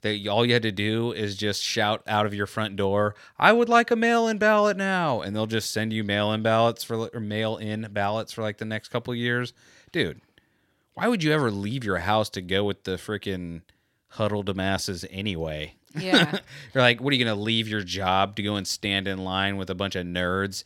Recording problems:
none

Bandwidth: 16.5 kHz